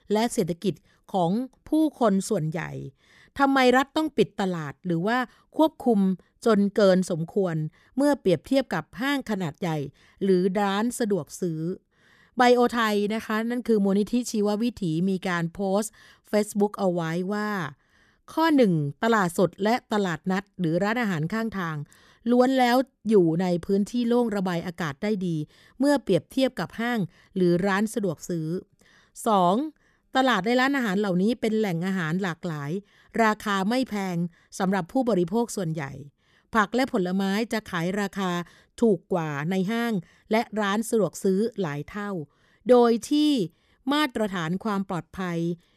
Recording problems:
none

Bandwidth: 14 kHz